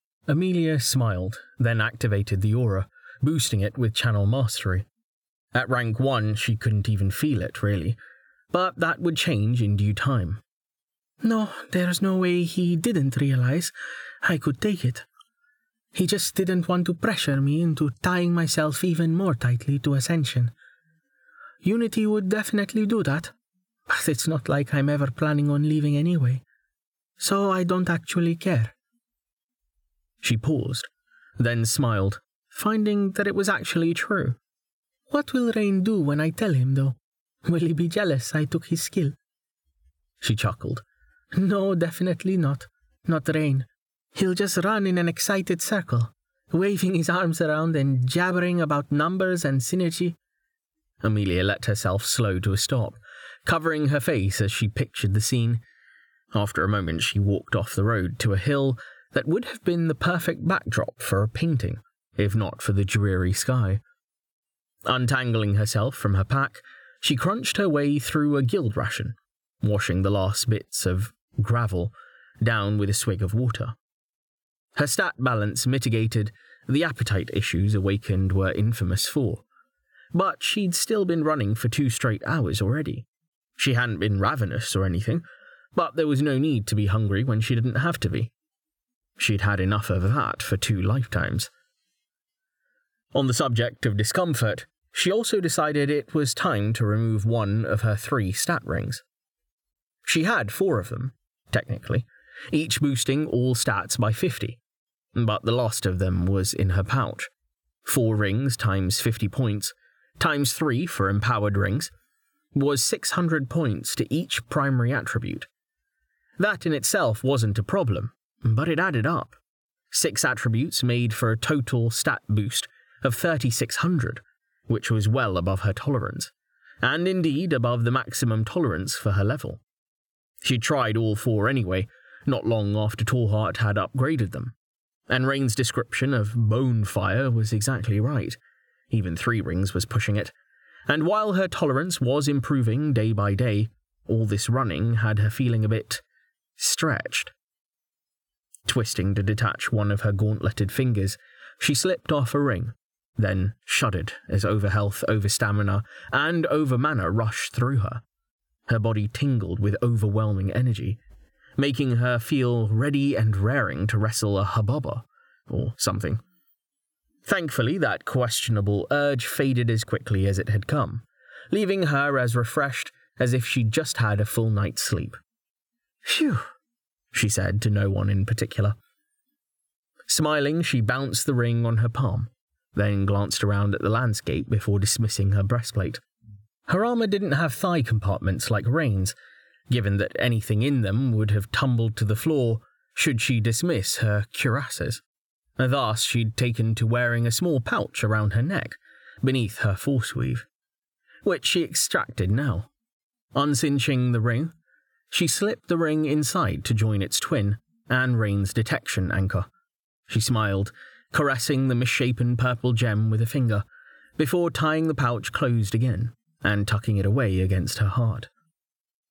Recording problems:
squashed, flat; somewhat

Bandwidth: 18.5 kHz